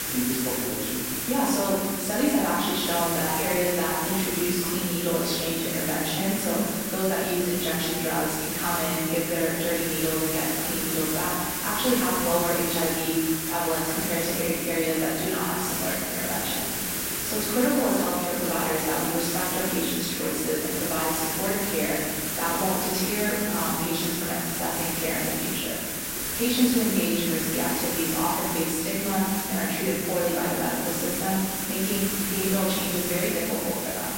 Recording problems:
room echo; strong; dies away in 1.4 s
off-mic speech; far
hiss; loud; throughout; 1 dB below the speech

